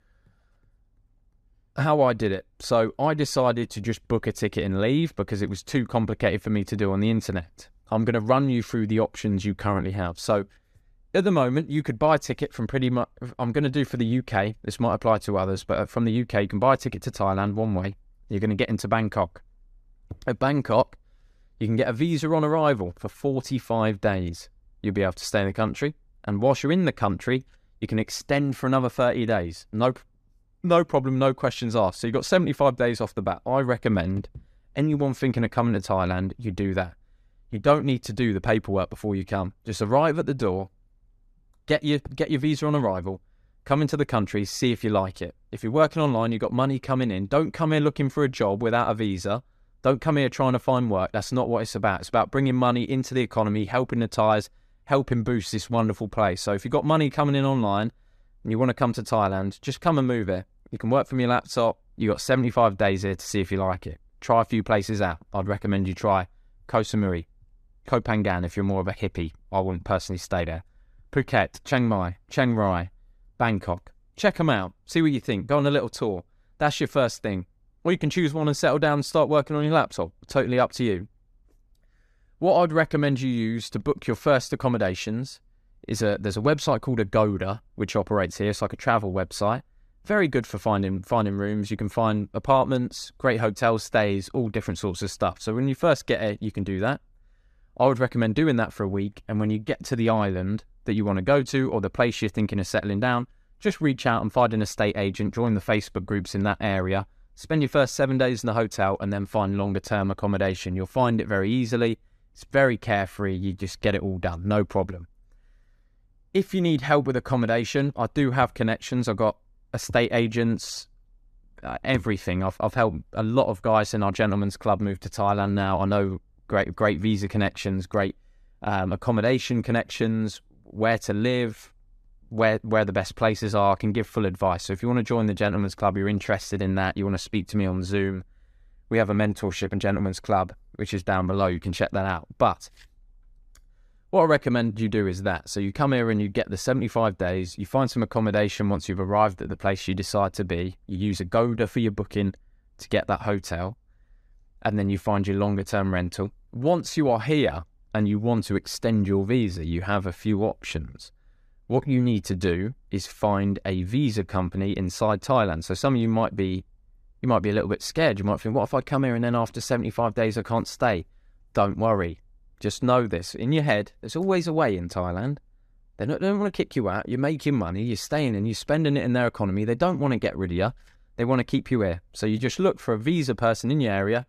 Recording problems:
none

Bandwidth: 14.5 kHz